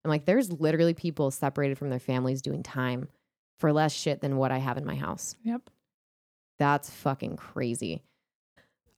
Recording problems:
none

